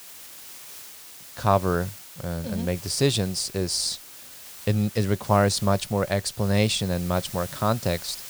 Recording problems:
hiss; noticeable; throughout; 15 dB below the speech

